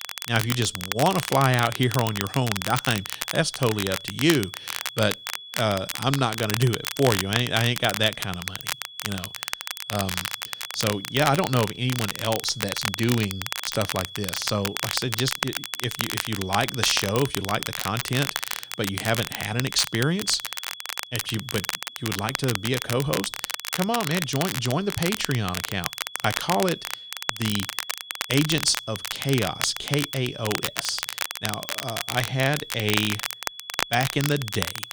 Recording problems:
crackle, like an old record; loud; 4 dB below the speech
high-pitched whine; noticeable; throughout; 3.5 kHz, 15 dB below the speech

